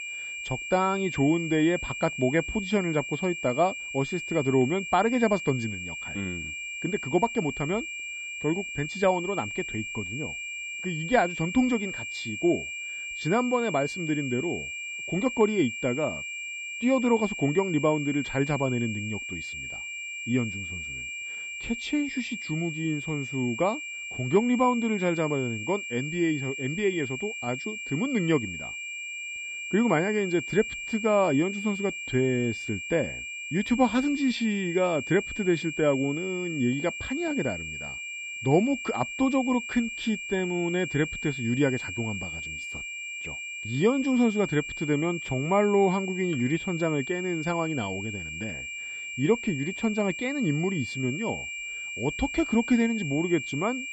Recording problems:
muffled; slightly; fading above 3 kHz
high-pitched whine; loud; throughout; 2.5 kHz, 6 dB below the speech

